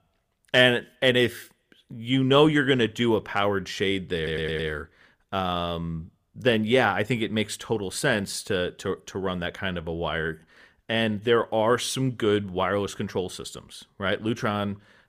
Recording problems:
audio stuttering; at 4 s

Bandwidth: 15 kHz